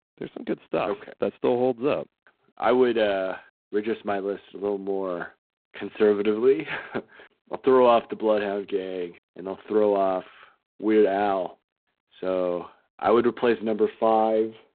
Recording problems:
phone-call audio; poor line; nothing above 3.5 kHz

